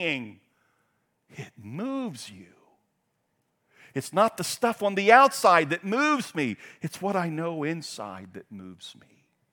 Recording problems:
abrupt cut into speech; at the start

